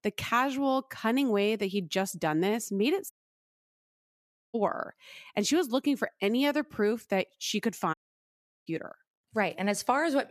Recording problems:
audio cutting out; at 3 s for 1.5 s and at 8 s for 0.5 s

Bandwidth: 14.5 kHz